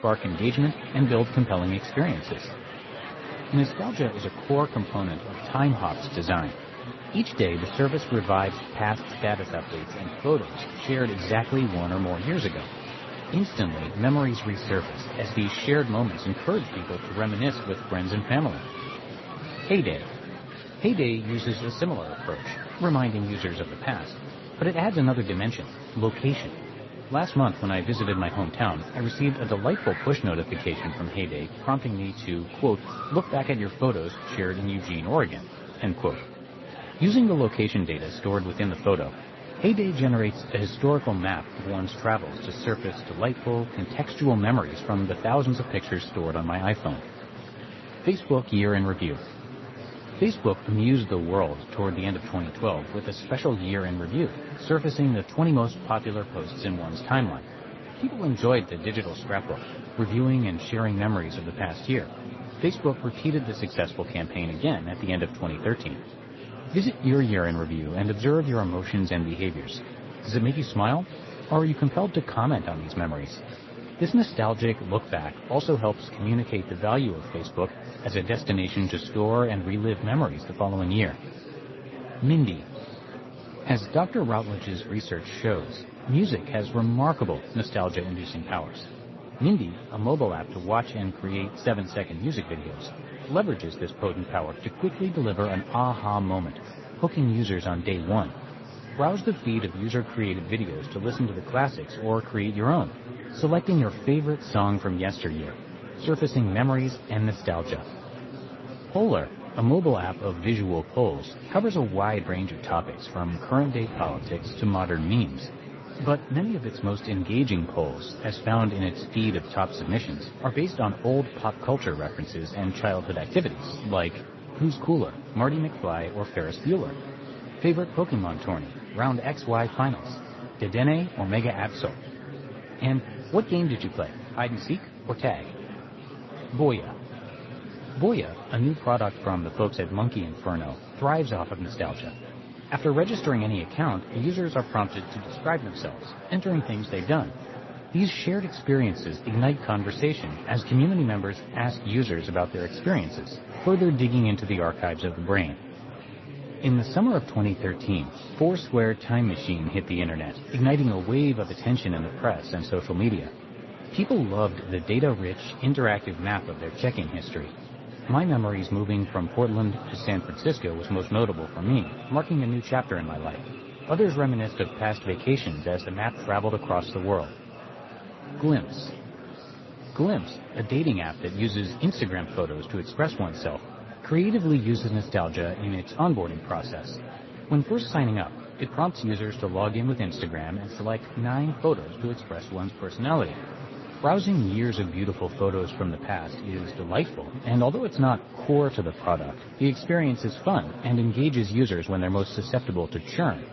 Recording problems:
garbled, watery; slightly; nothing above 6 kHz
murmuring crowd; noticeable; throughout; 15 dB below the speech
animal sounds; faint; throughout; 25 dB below the speech

